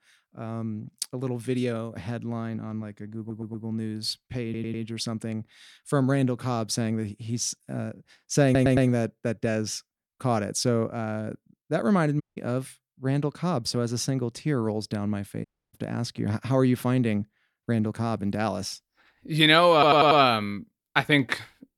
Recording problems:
audio stuttering; 4 times, first at 3 s
audio cutting out; at 12 s and at 15 s

